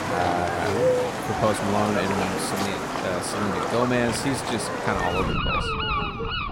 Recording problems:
animal sounds; very loud; throughout; 1 dB above the speech
dog barking; noticeable; at 5.5 s; peak 8 dB below the speech

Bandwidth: 16 kHz